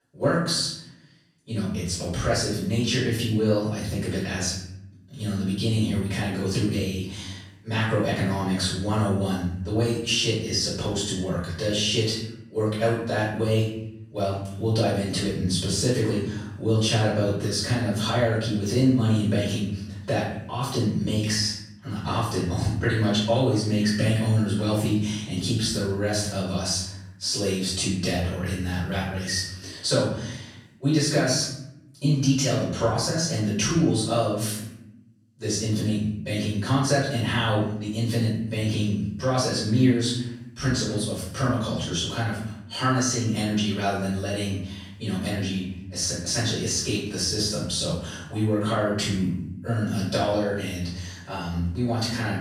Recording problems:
off-mic speech; far
room echo; noticeable; dies away in 0.7 s

